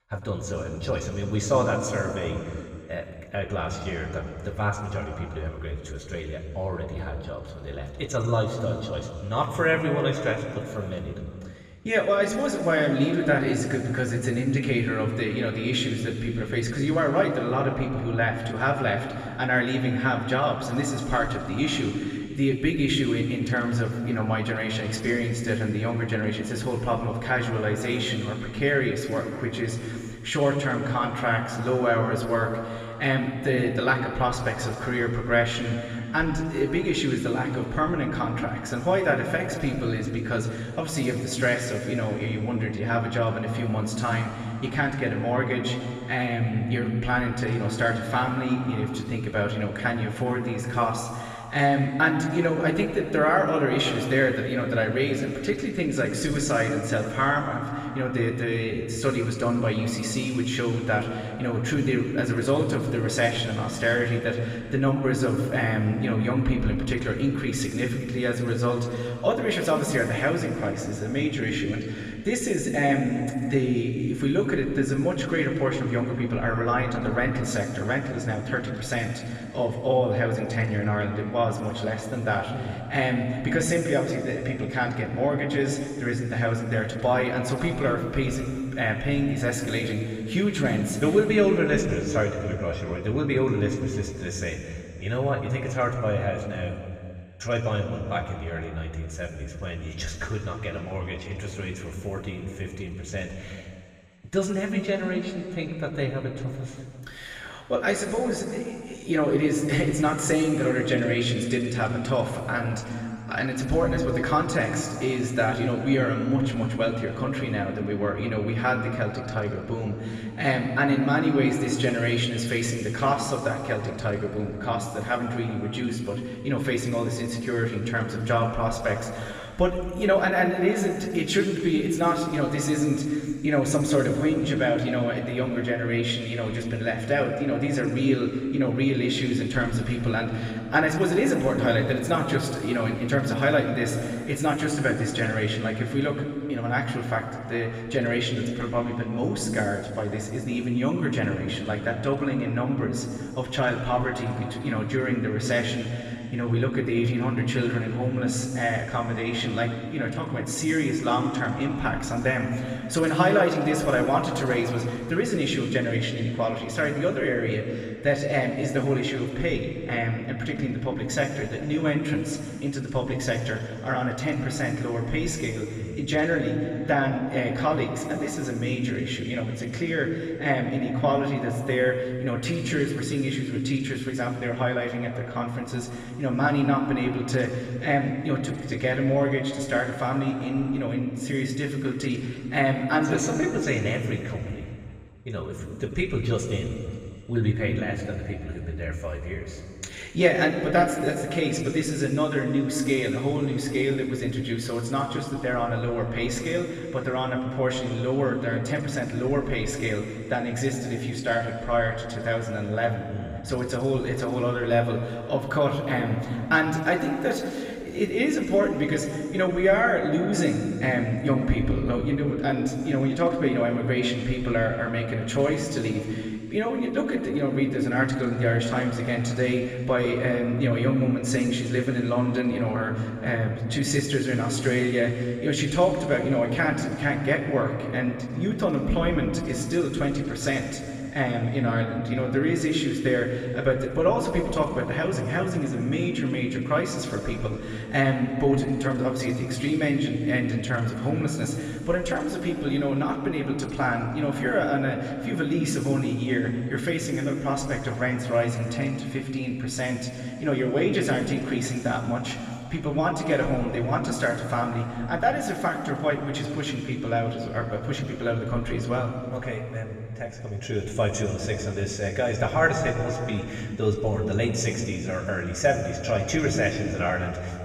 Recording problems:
room echo; noticeable; dies away in 2.3 s
off-mic speech; somewhat distant

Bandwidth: 15.5 kHz